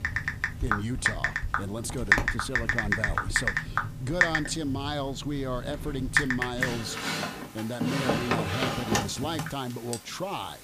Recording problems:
household noises; very loud; throughout; 5 dB above the speech

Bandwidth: 15 kHz